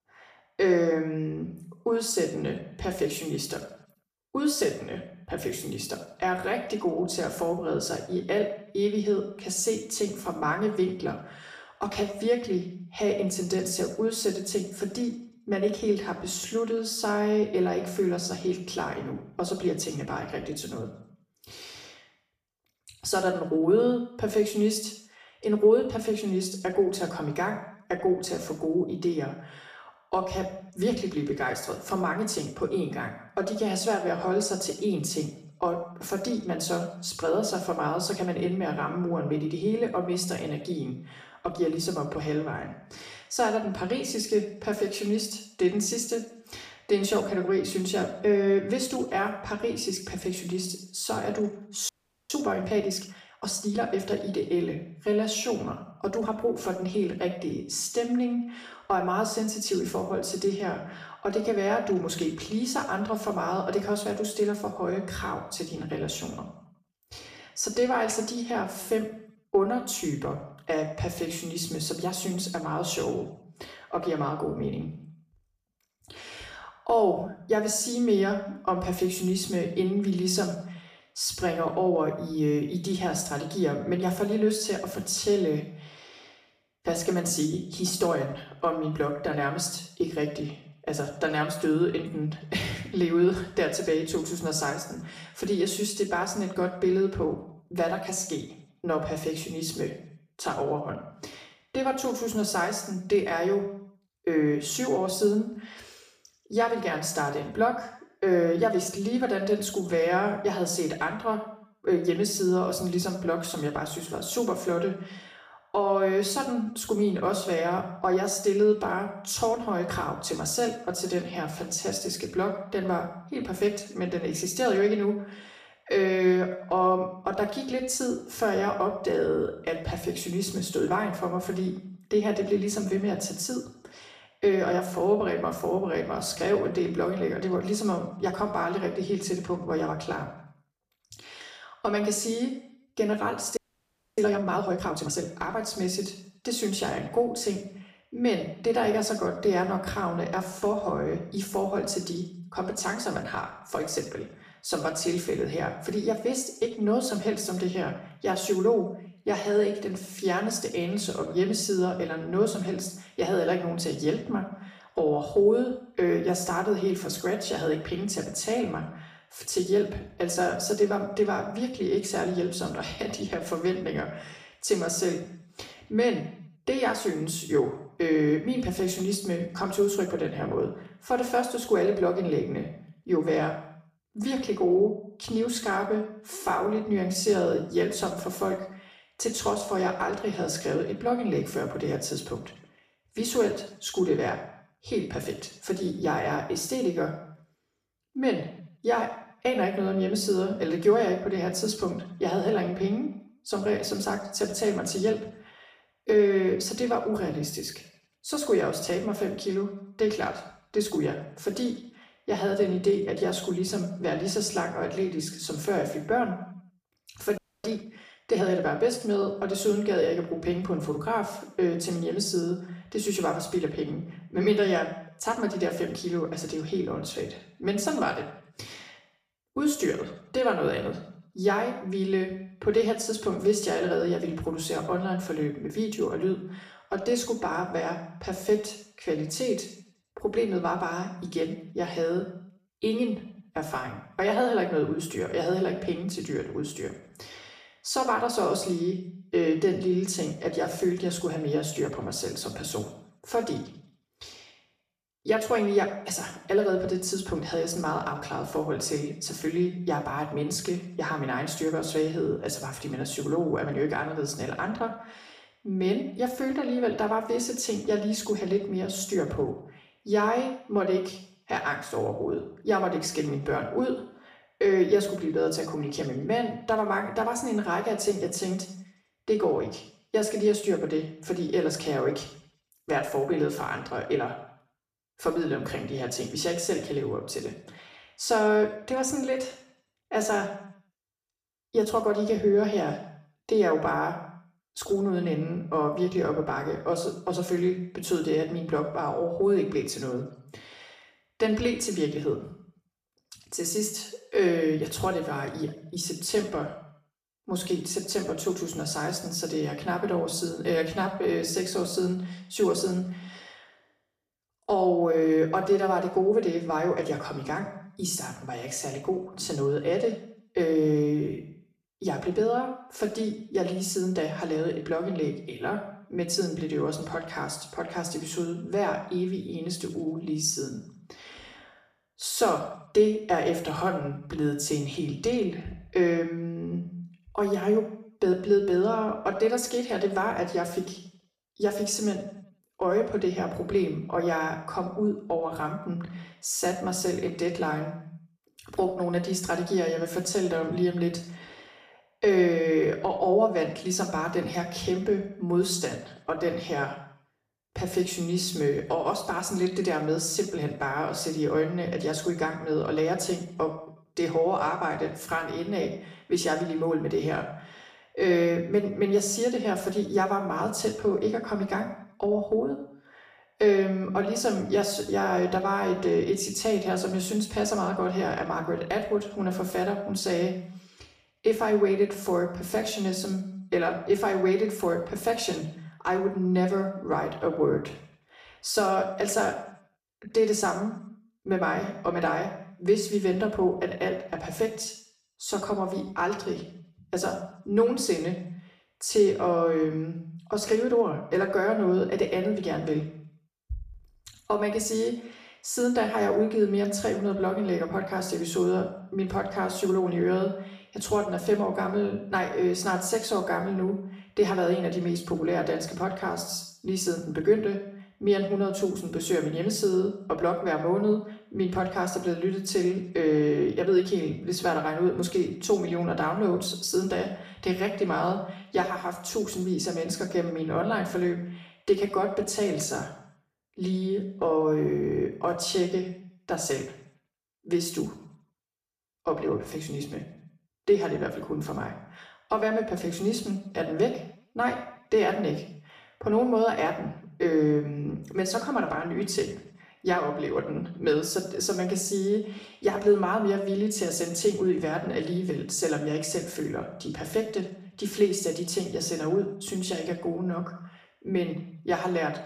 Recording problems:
off-mic speech; far
room echo; slight; dies away in 0.6 s
audio freezing; at 52 s, at 2:24 for 0.5 s and at 3:37

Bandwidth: 15 kHz